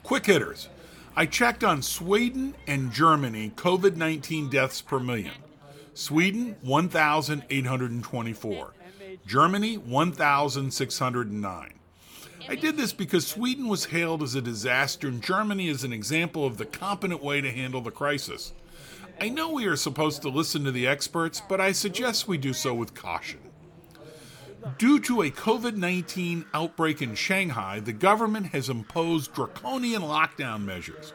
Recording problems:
animal sounds; faint; throughout; 25 dB below the speech
background chatter; faint; throughout; 3 voices, 25 dB below the speech

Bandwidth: 18 kHz